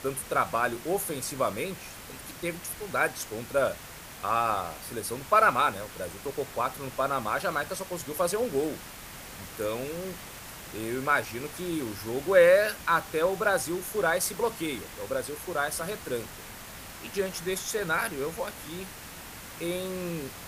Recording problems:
hiss; noticeable; throughout; 15 dB below the speech

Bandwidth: 15 kHz